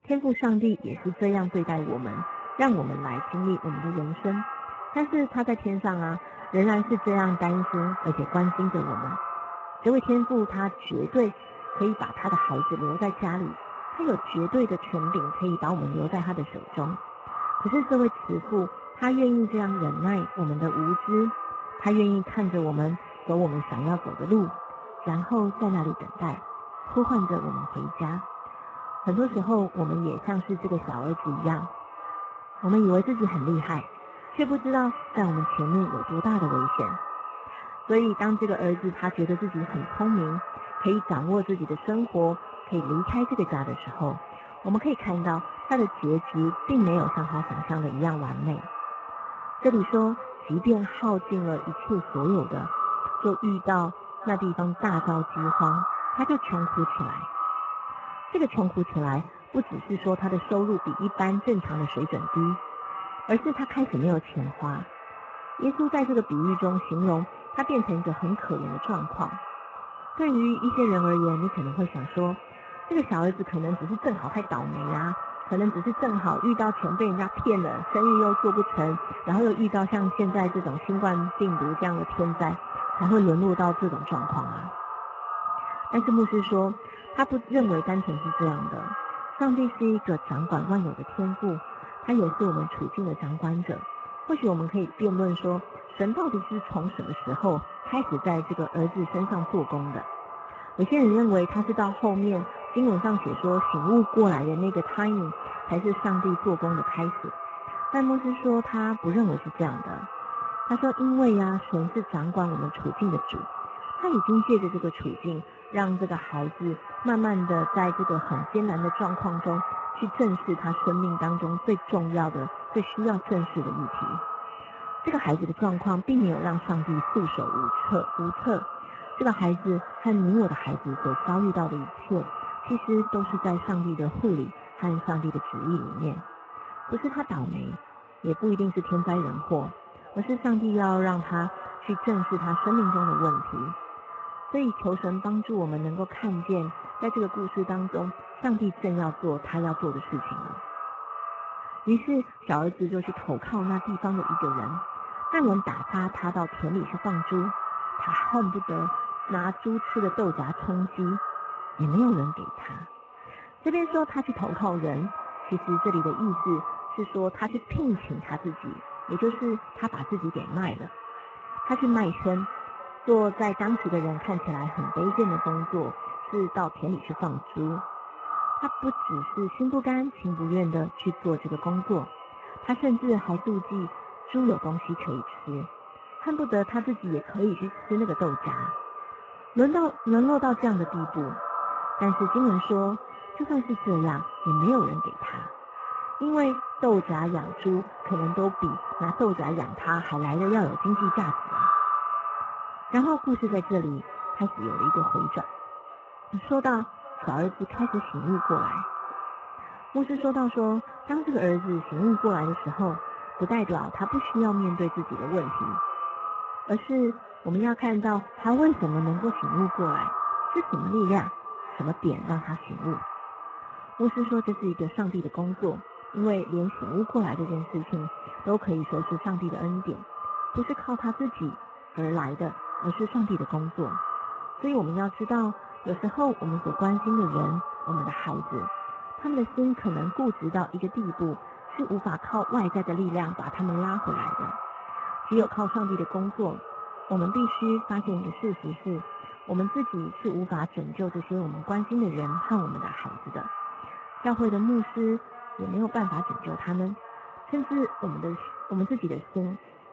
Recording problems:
echo of what is said; strong; throughout; 520 ms later, 6 dB below the speech
garbled, watery; badly; nothing above 7.5 kHz

